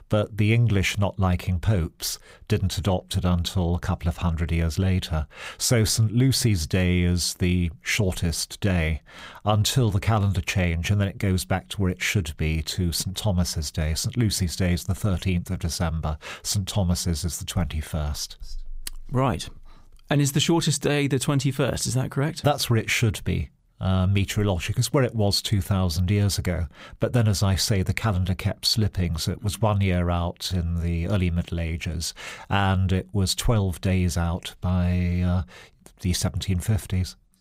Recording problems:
none

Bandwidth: 15.5 kHz